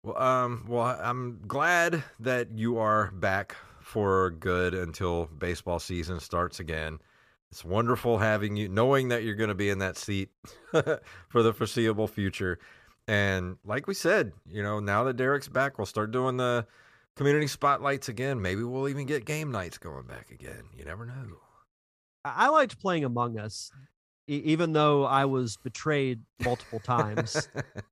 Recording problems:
none

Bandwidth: 14.5 kHz